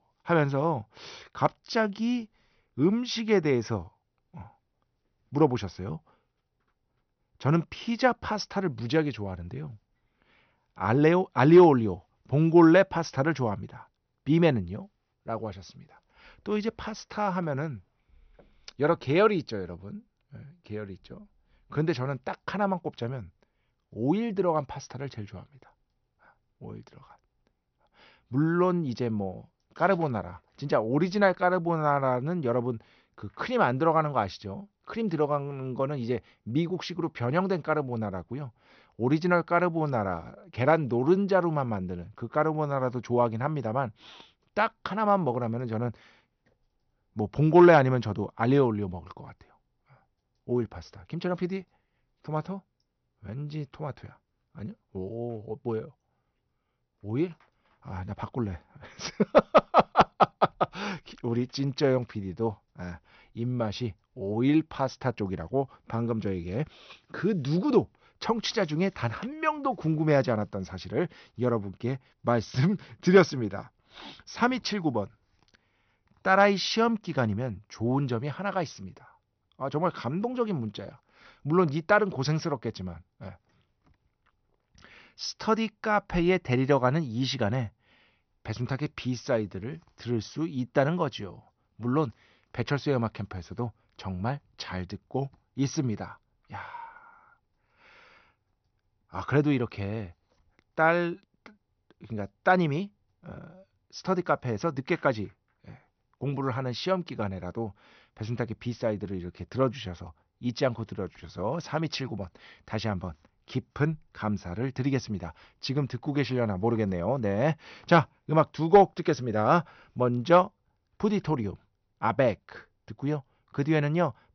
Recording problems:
high frequencies cut off; noticeable; nothing above 6 kHz

